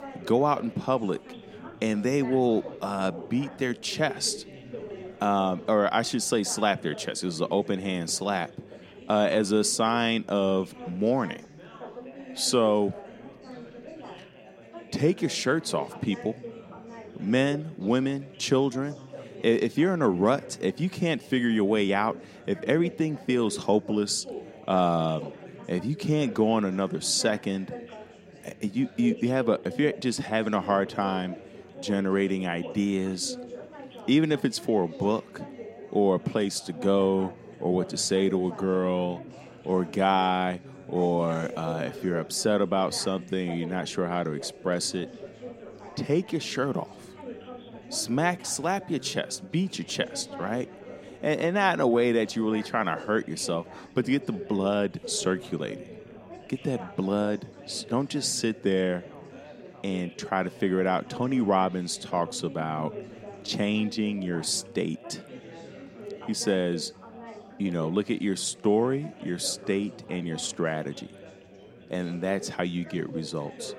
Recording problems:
chatter from many people; noticeable; throughout; 15 dB below the speech

